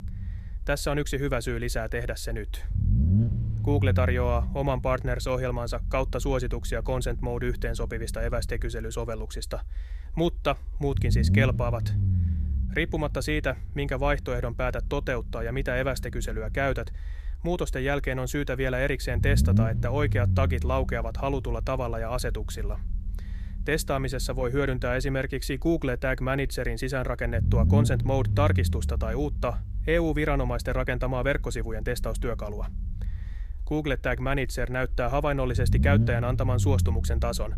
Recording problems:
low rumble; noticeable; throughout; 10 dB below the speech

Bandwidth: 14.5 kHz